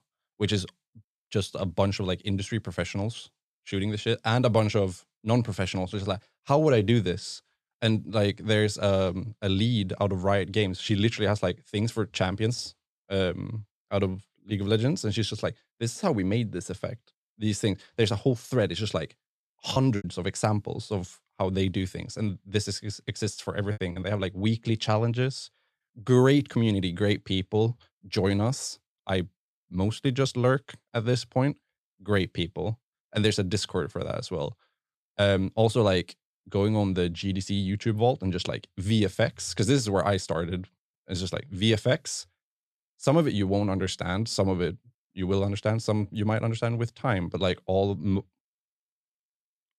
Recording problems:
choppy; very; at 20 s and at 24 s; 8% of the speech affected

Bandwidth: 13.5 kHz